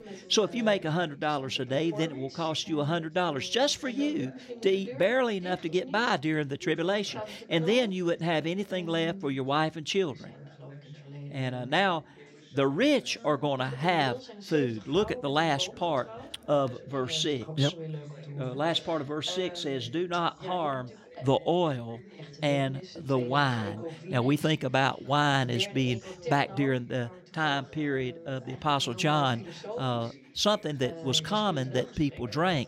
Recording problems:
background chatter; noticeable; throughout; 2 voices, 15 dB below the speech

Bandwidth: 16 kHz